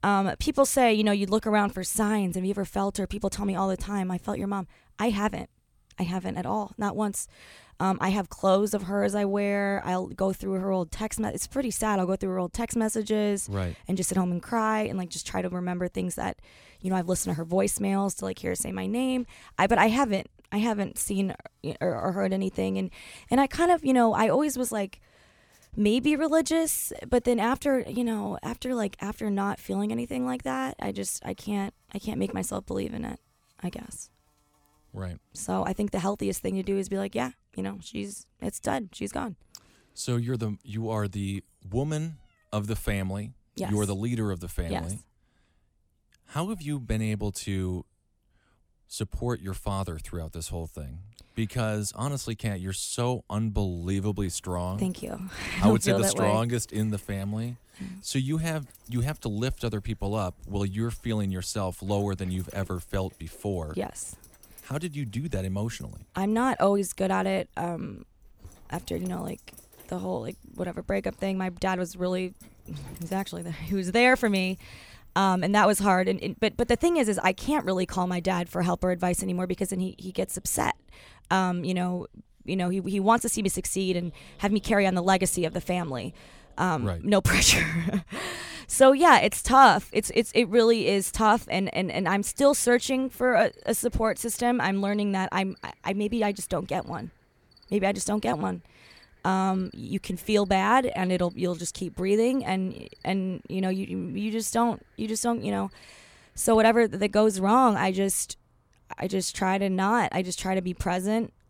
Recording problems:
animal sounds; faint; throughout; 30 dB below the speech

